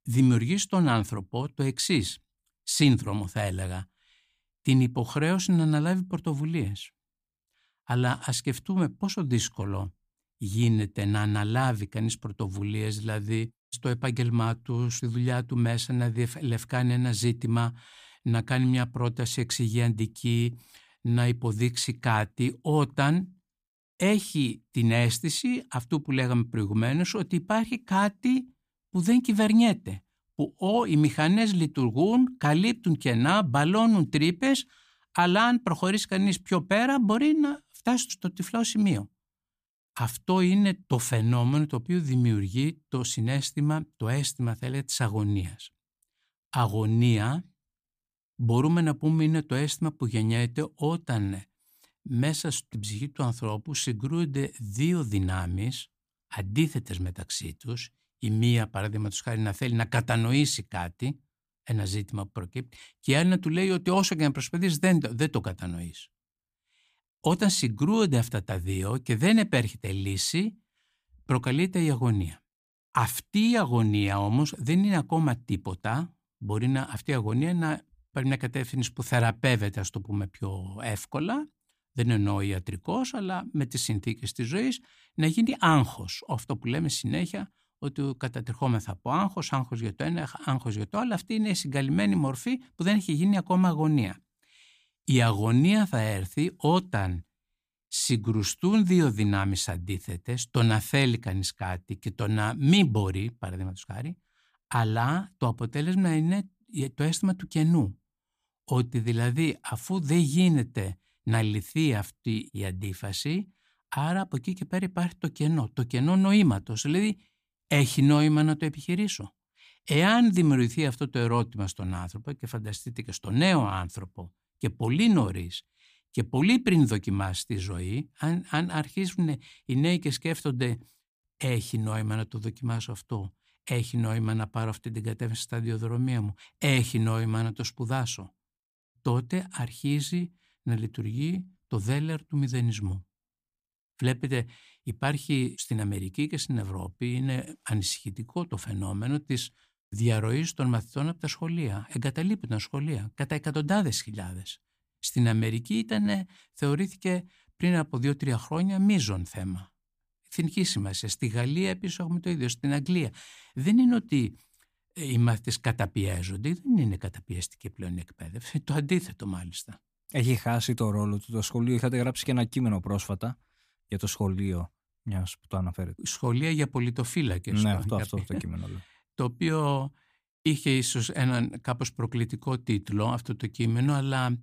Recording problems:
none

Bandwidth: 15 kHz